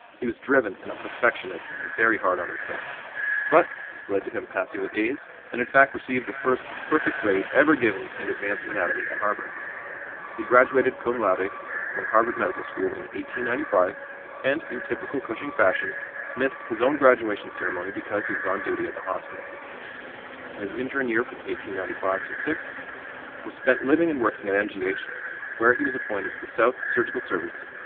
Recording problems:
phone-call audio; poor line
echo of what is said; strong; throughout; 570 ms later, 8 dB below the speech
traffic noise; noticeable; throughout; 15 dB below the speech

